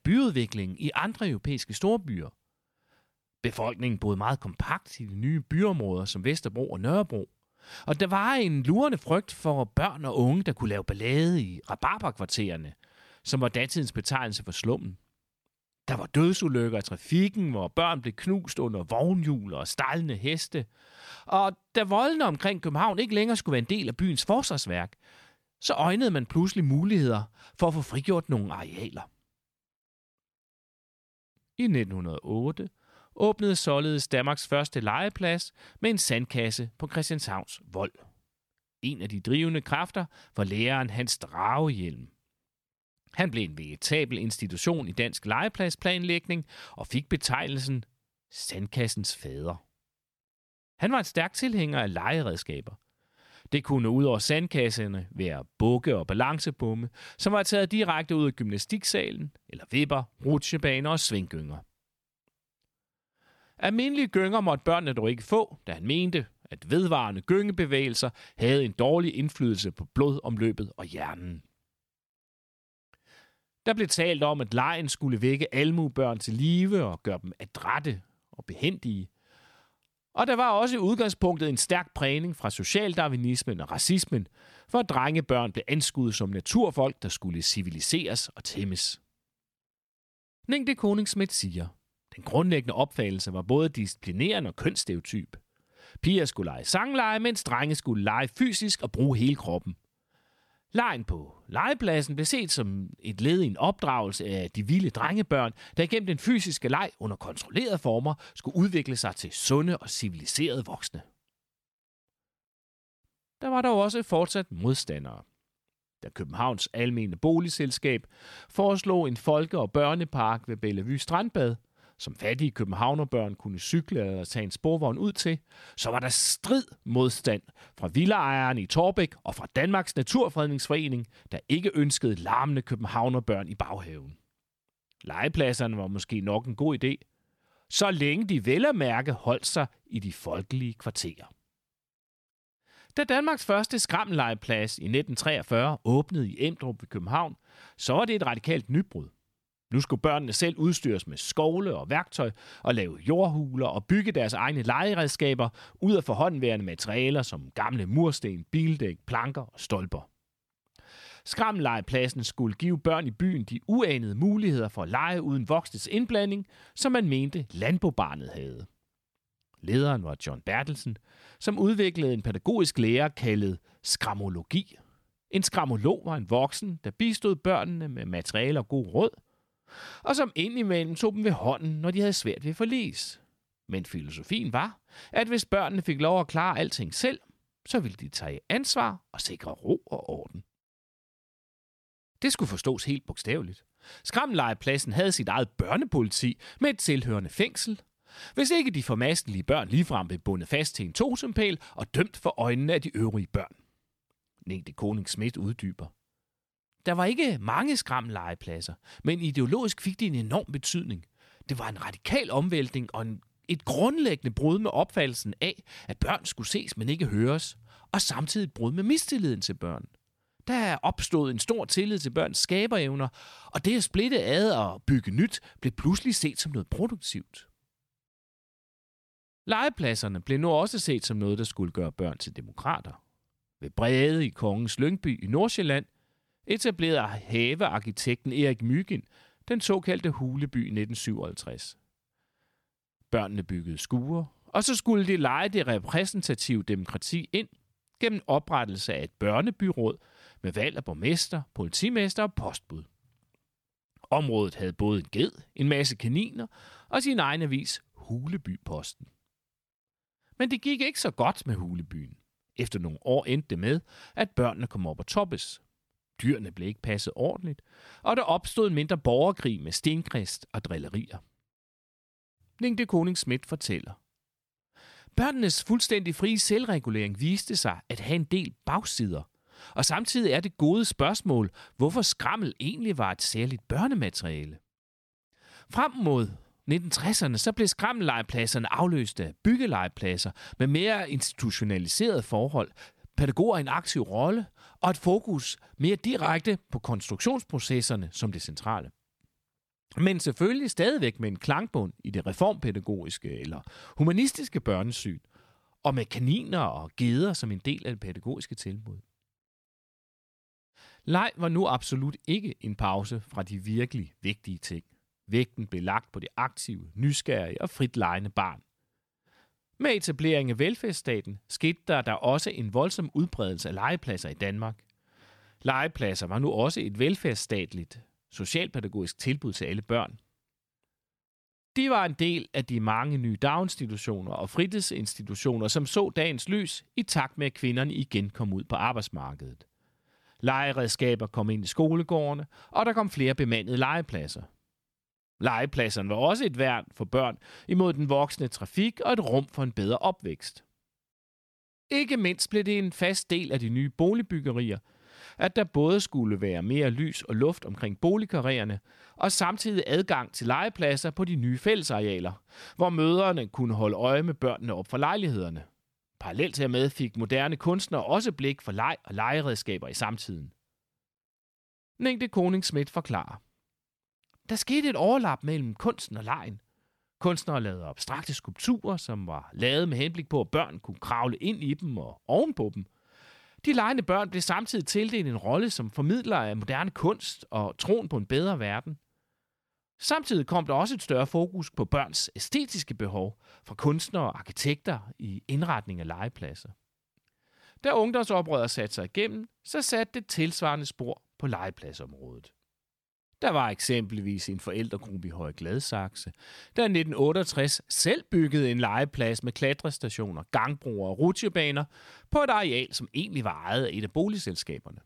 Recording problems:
none

